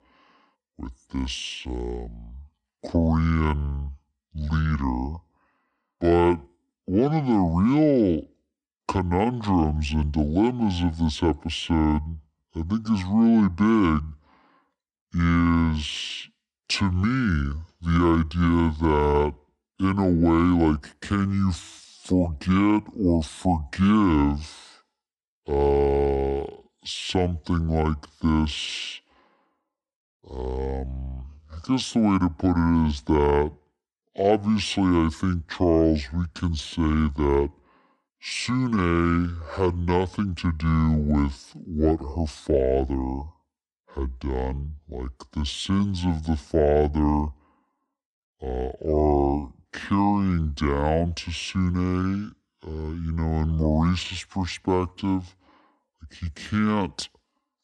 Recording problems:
wrong speed and pitch; too slow and too low; 0.6 times normal speed

